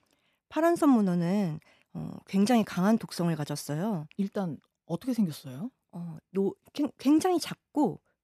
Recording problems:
none

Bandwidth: 14.5 kHz